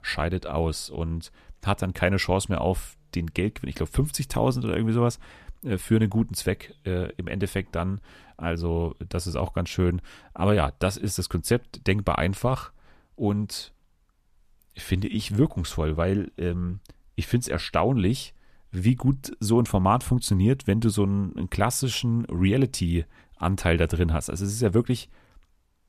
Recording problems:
none

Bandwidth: 14.5 kHz